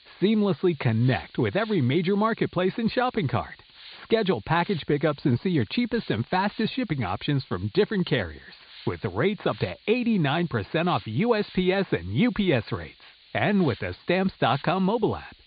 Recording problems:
high frequencies cut off; severe; nothing above 4.5 kHz
hiss; faint; throughout; 25 dB below the speech

